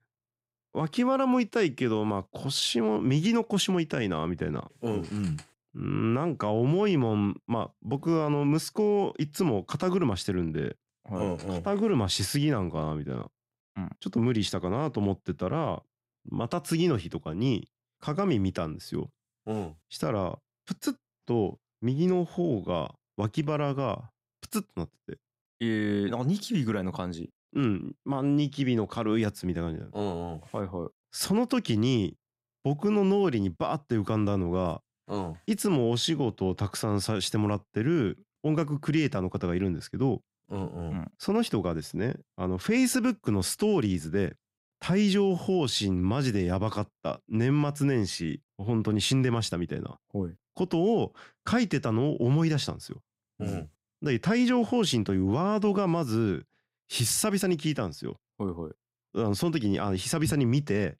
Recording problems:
none

